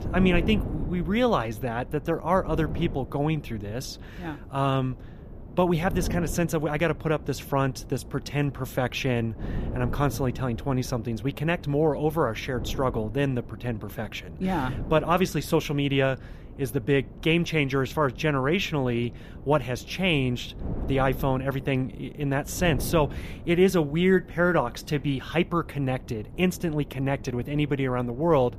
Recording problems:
wind noise on the microphone; occasional gusts; 20 dB below the speech

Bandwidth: 14.5 kHz